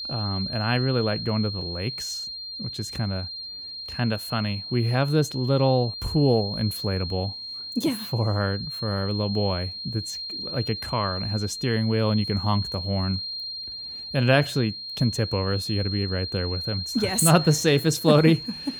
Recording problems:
high-pitched whine; loud; throughout; 4 kHz, 7 dB below the speech

